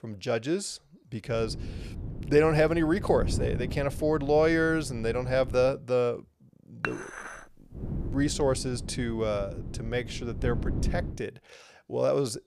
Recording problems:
wind noise on the microphone; occasional gusts; from 1.5 to 5.5 s and from 8 to 11 s; 15 dB below the speech
clattering dishes; noticeable; at 7 s; peak 7 dB below the speech

